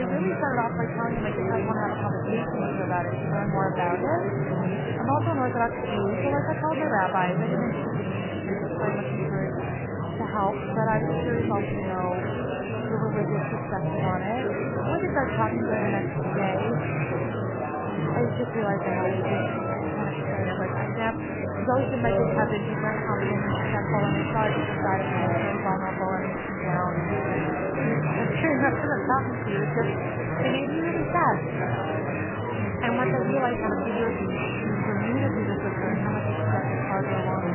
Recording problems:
garbled, watery; badly; nothing above 3 kHz
murmuring crowd; very loud; throughout; 2 dB above the speech
abrupt cut into speech; at the start

